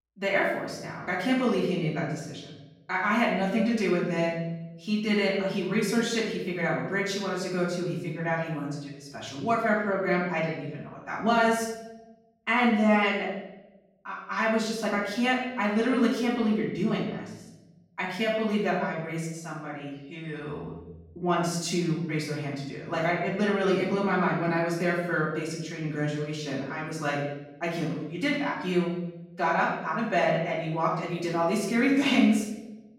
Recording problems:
off-mic speech; far
room echo; noticeable; dies away in 0.9 s

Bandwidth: 16 kHz